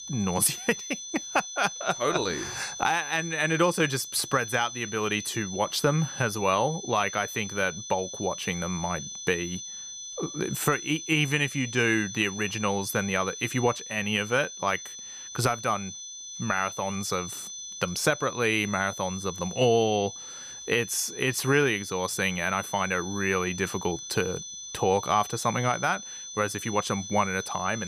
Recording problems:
high-pitched whine; loud; throughout; 6 kHz, 9 dB below the speech
abrupt cut into speech; at the end

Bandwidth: 15 kHz